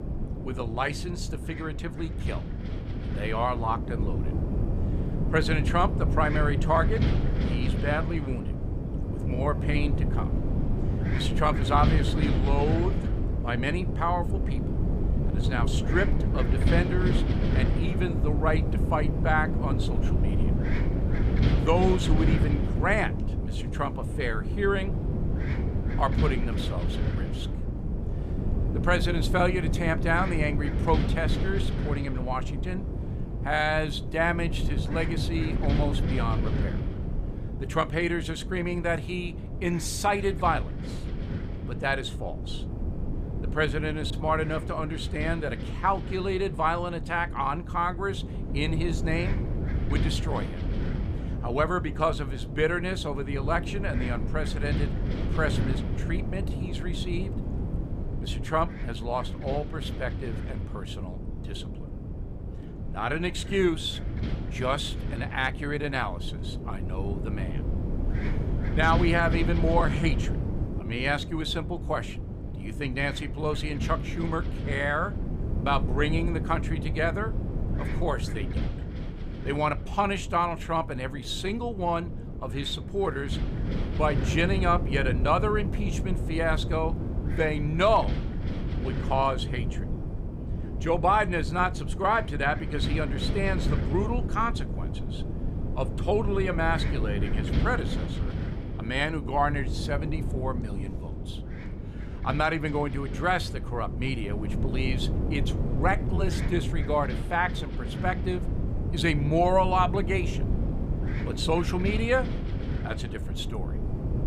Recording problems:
wind noise on the microphone; occasional gusts; 10 dB below the speech
uneven, jittery; slightly; from 9 s to 1:46

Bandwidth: 15 kHz